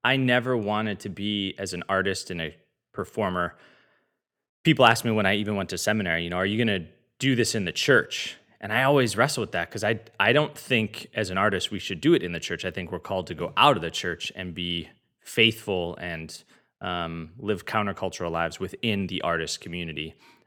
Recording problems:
none

